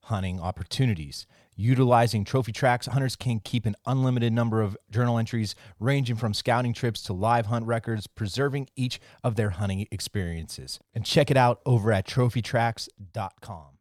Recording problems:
uneven, jittery; strongly; from 0.5 to 13 s

